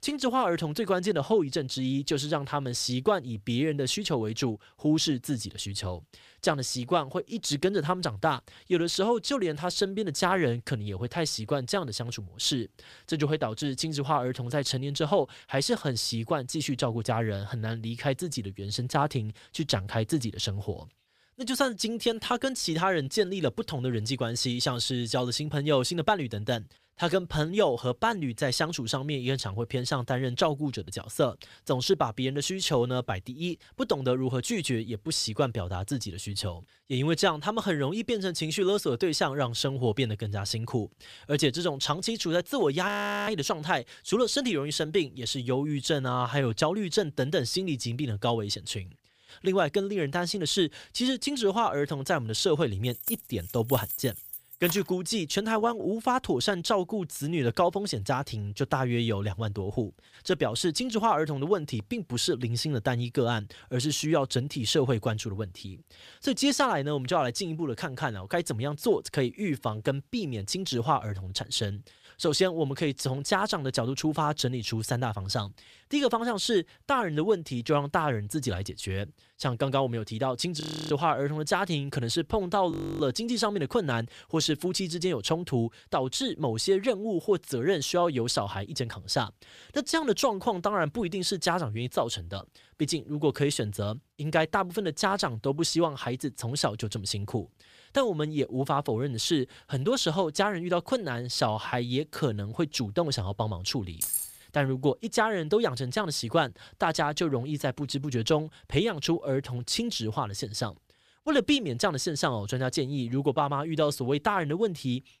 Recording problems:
audio freezing; at 43 s, at 1:21 and at 1:23
jangling keys; noticeable; from 53 to 55 s and at 1:44; peak level with the speech

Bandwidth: 15 kHz